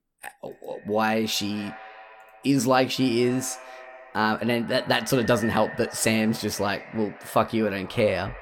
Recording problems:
echo of what is said; noticeable; throughout; 230 ms later, 15 dB below the speech

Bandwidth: 17.5 kHz